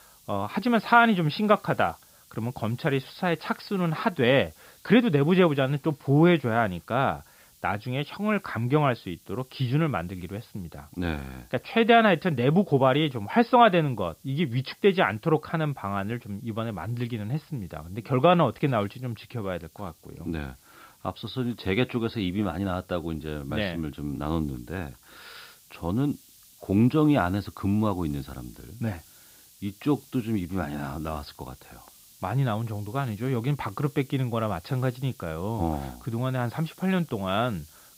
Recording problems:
high frequencies cut off; noticeable; nothing above 5.5 kHz
hiss; faint; throughout; 25 dB below the speech

